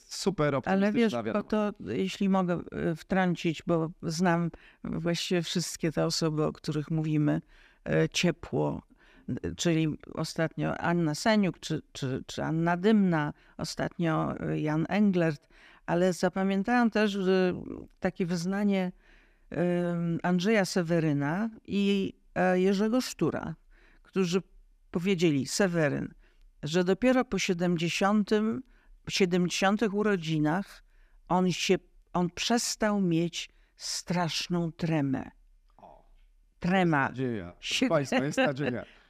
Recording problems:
none

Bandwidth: 15 kHz